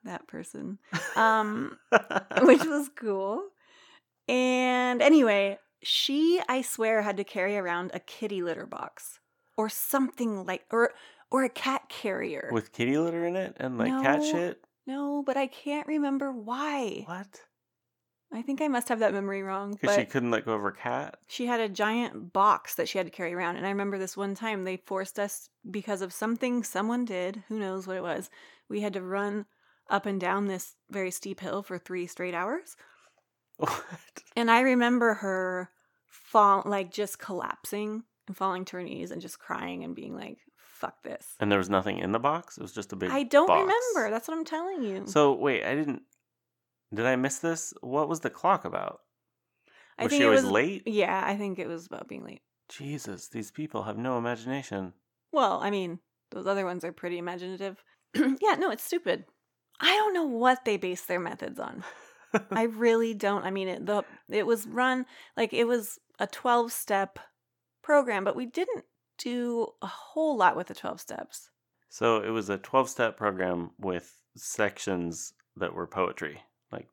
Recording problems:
none

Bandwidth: 18 kHz